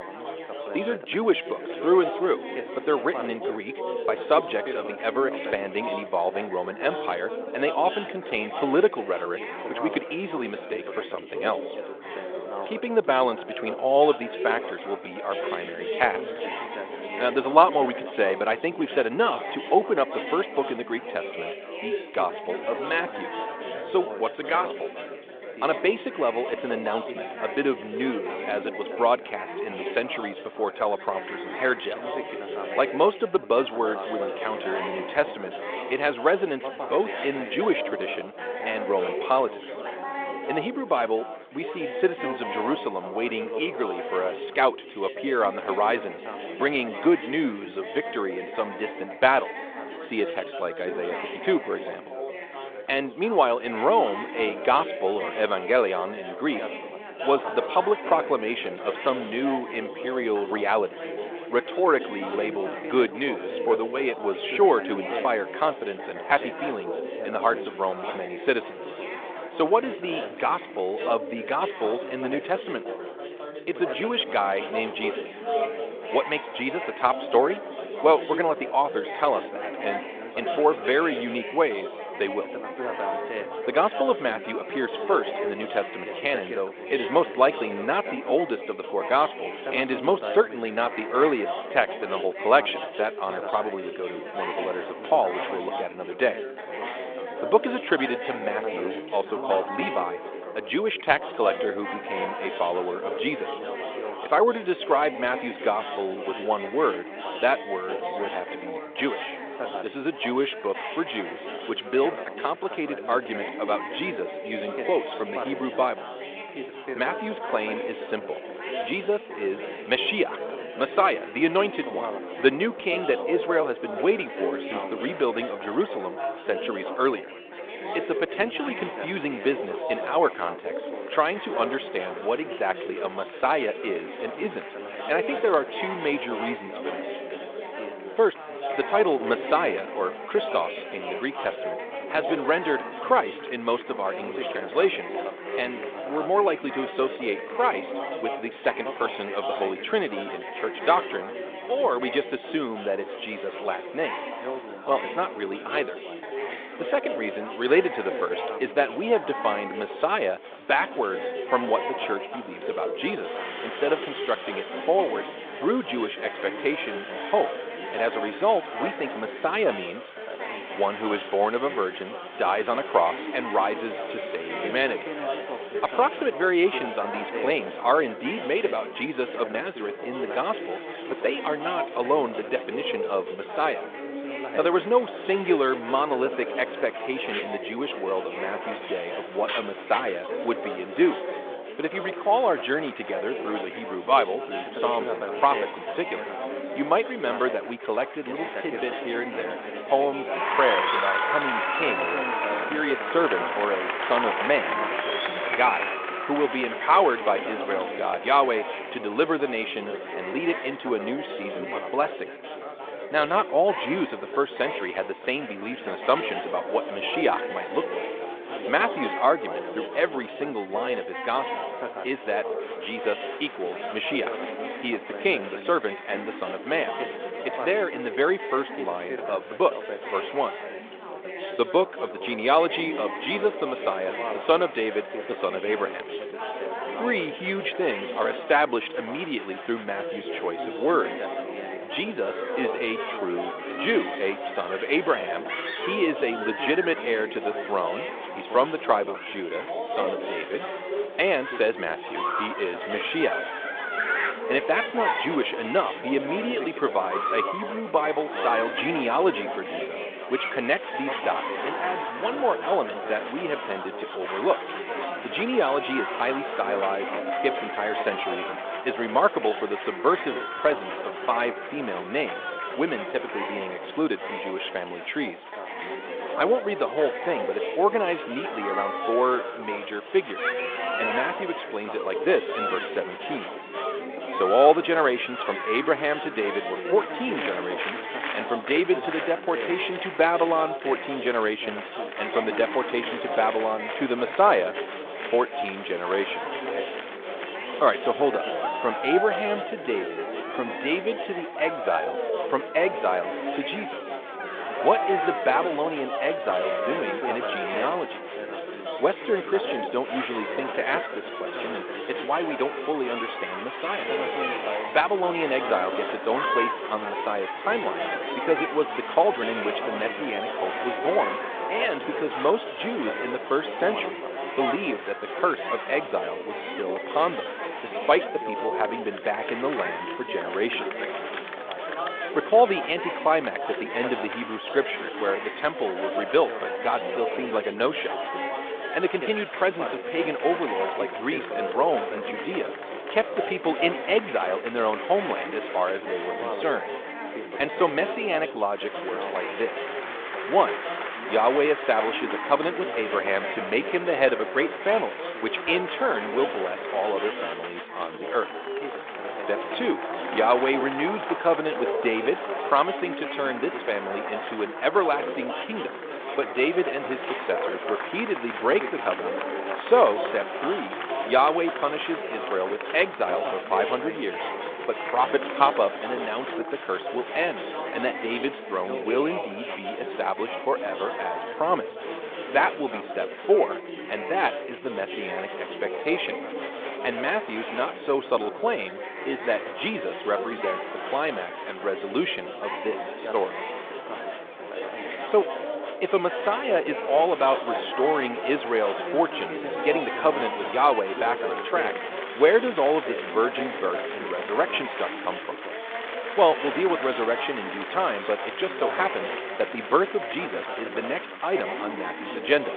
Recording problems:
phone-call audio
chatter from many people; loud; throughout; 6 dB below the speech

